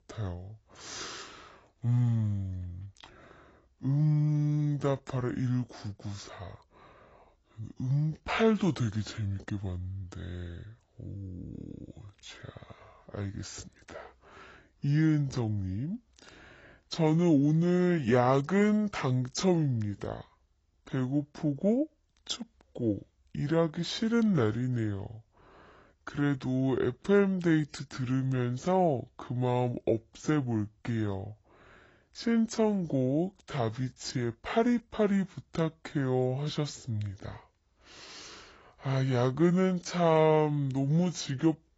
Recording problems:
garbled, watery; badly; nothing above 7.5 kHz
wrong speed and pitch; too slow and too low; 0.7 times normal speed

